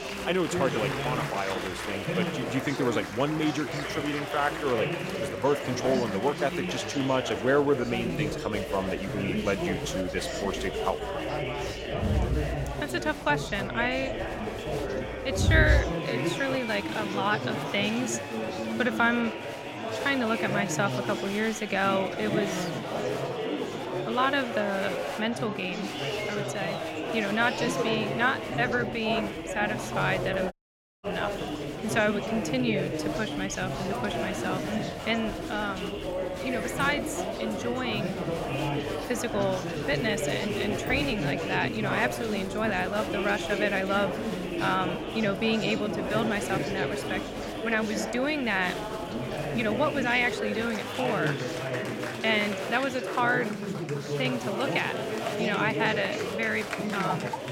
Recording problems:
chatter from many people; loud; throughout; 2 dB below the speech
audio cutting out; at 31 s for 0.5 s

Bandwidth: 16 kHz